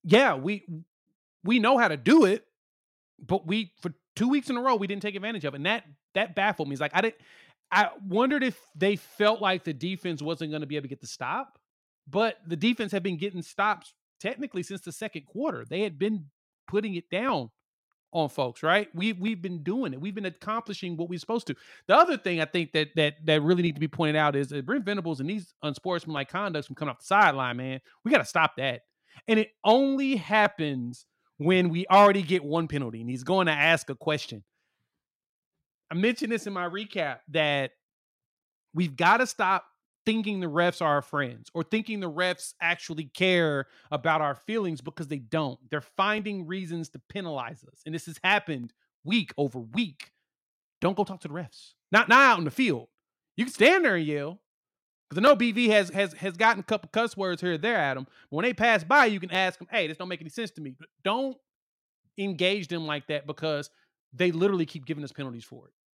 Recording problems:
none

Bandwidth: 16.5 kHz